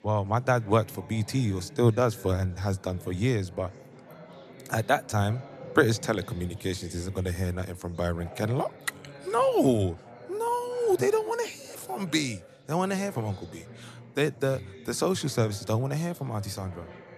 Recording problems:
chatter from many people; noticeable; throughout; 20 dB below the speech

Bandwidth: 14 kHz